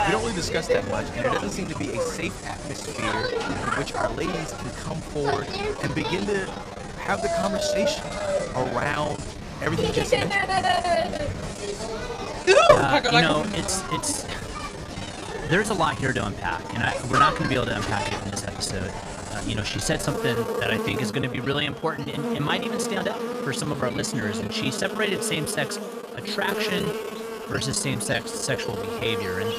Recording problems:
animal sounds; very loud; throughout; as loud as the speech
machinery noise; noticeable; throughout; 20 dB below the speech
choppy; very; 14% of the speech affected

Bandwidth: 14.5 kHz